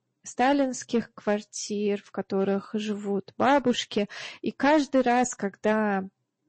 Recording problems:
distortion; slight; 2% of the sound clipped
garbled, watery; slightly; nothing above 7.5 kHz

